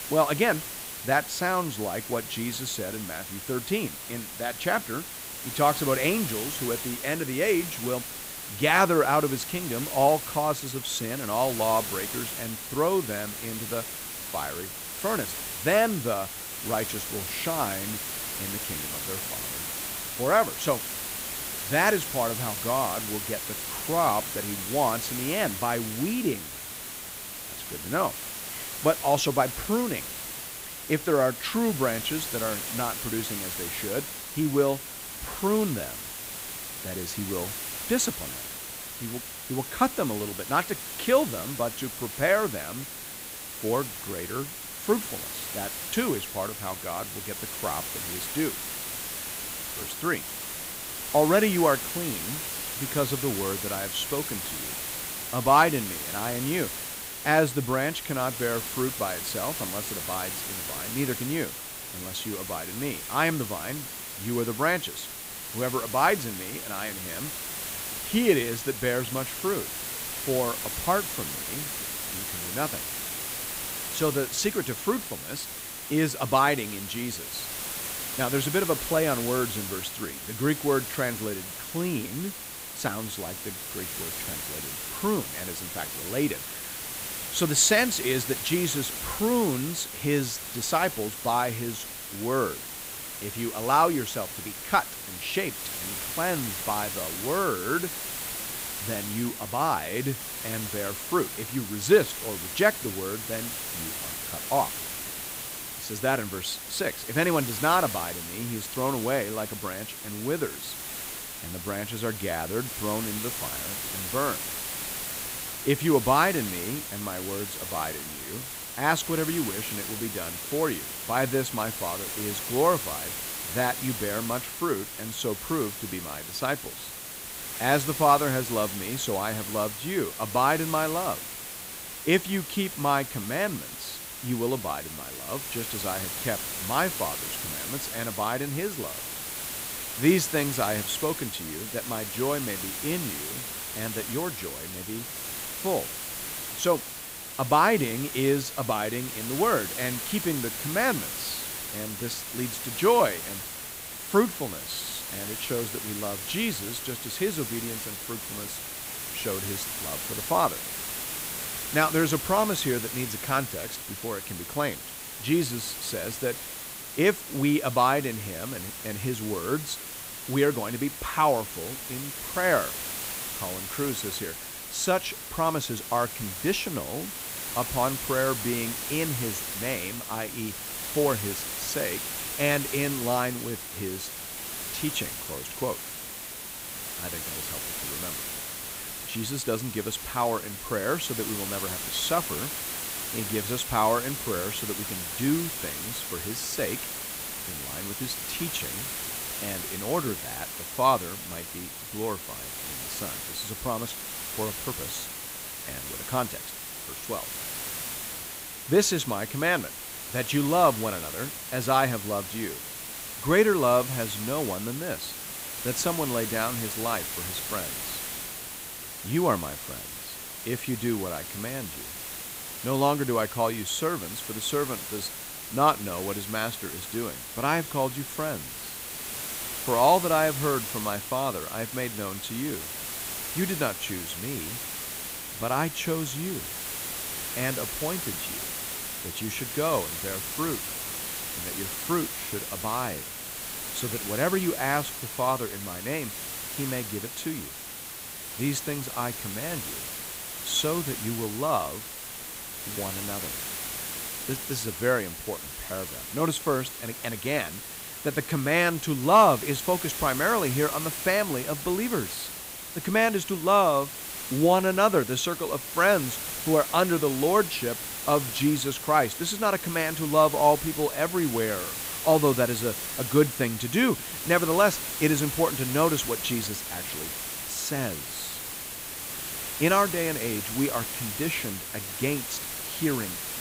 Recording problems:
hiss; loud; throughout; 5 dB below the speech

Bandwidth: 15.5 kHz